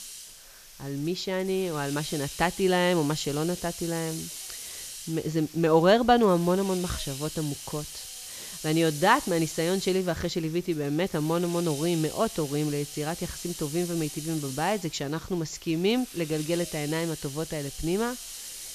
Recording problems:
high frequencies cut off; noticeable; nothing above 8 kHz
hiss; noticeable; throughout; 10 dB below the speech

